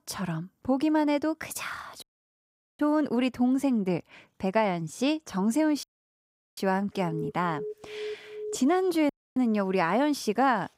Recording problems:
audio cutting out; at 2 s for 1 s, at 6 s for 0.5 s and at 9 s
alarm; faint; from 7 to 8.5 s; peak 10 dB below the speech

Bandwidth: 15.5 kHz